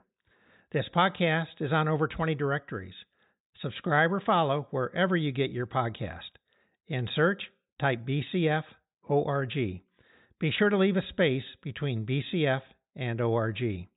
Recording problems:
high frequencies cut off; severe; nothing above 4 kHz

